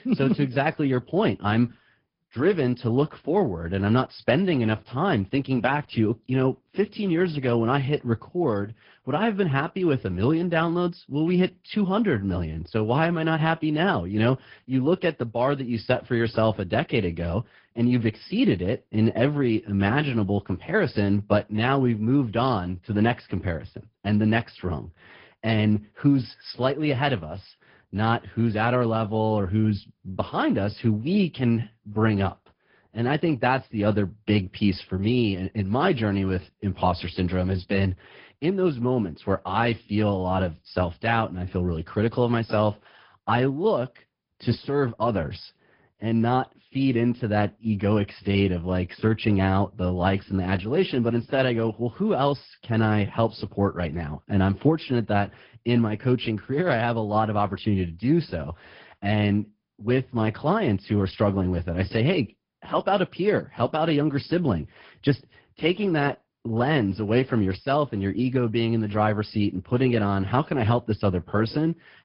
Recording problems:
high frequencies cut off; noticeable; nothing above 5 kHz
garbled, watery; slightly

